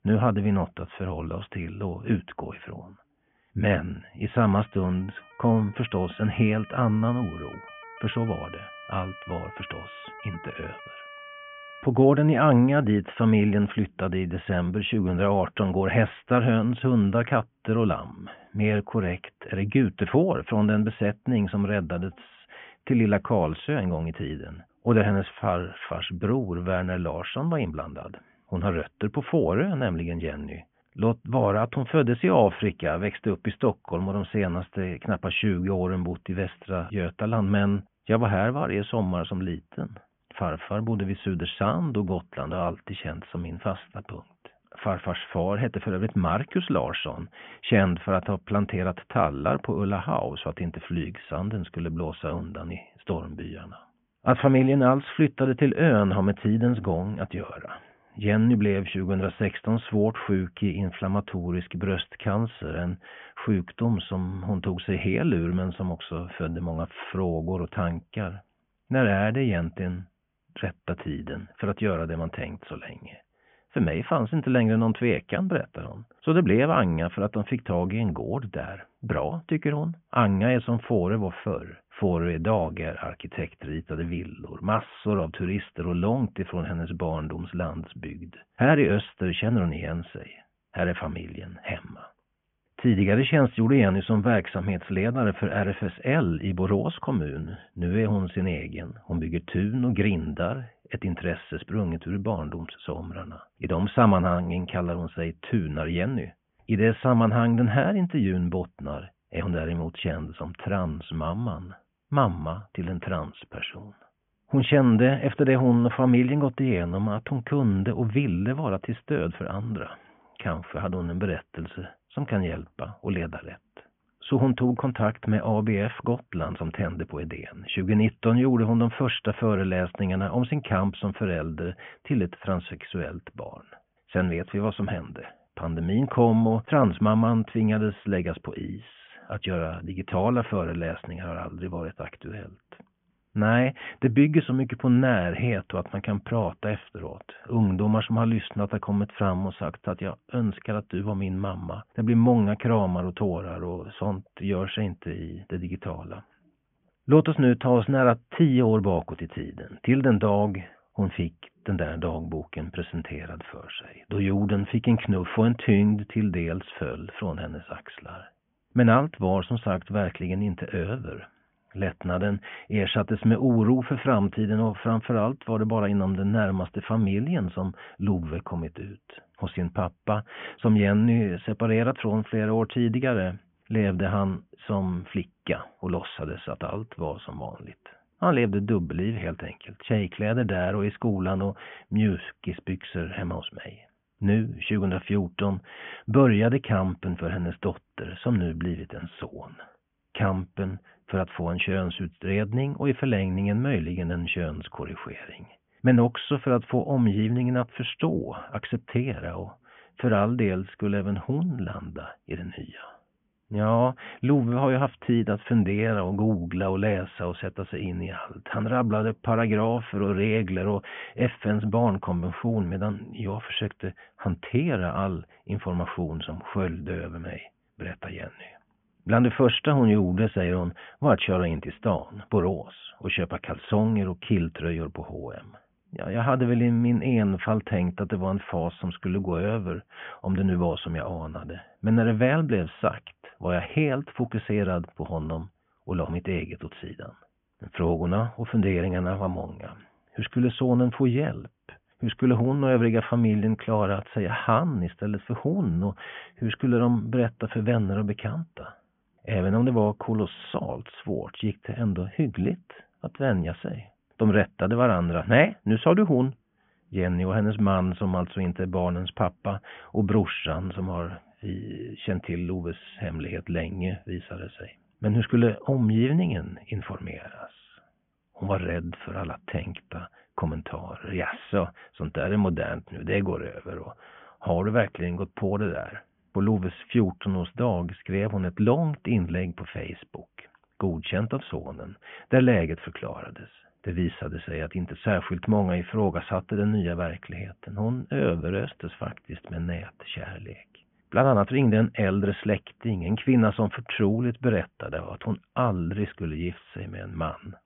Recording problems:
high frequencies cut off; severe; nothing above 3.5 kHz
siren; faint; from 4.5 to 12 s; peak 15 dB below the speech

